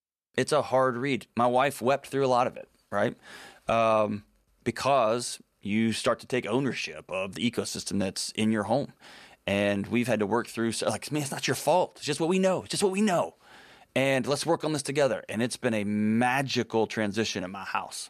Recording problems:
none

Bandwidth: 14 kHz